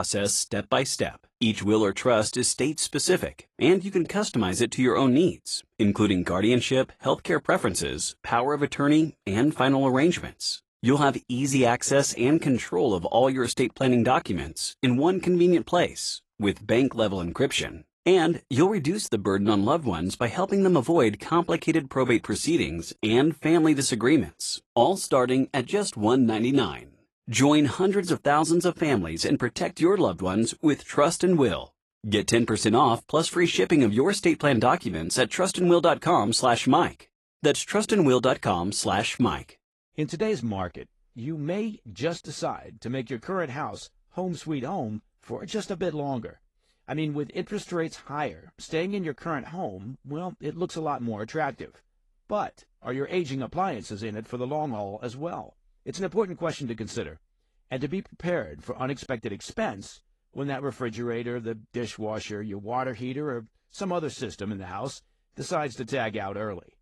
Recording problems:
garbled, watery; slightly; nothing above 11 kHz
abrupt cut into speech; at the start

